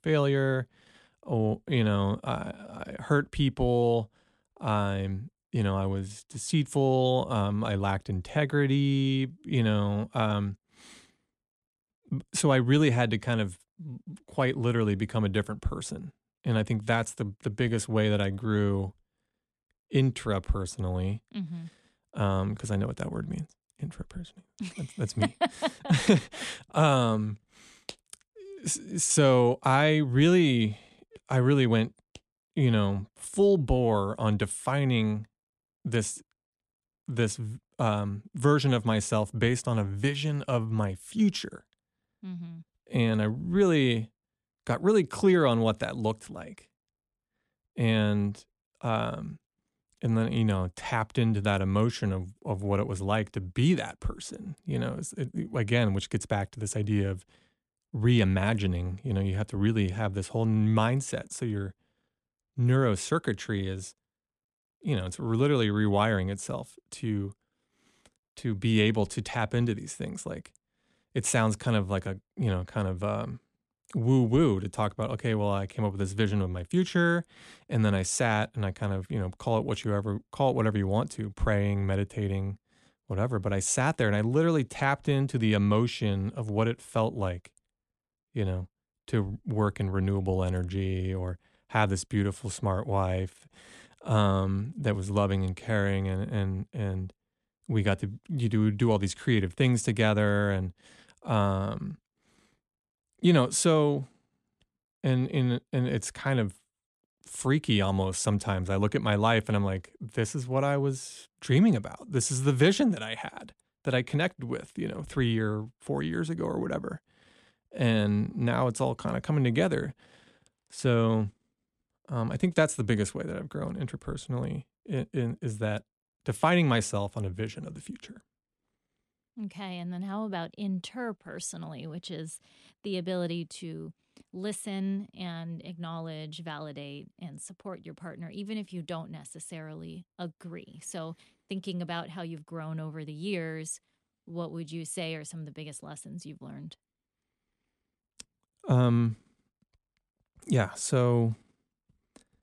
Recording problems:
none

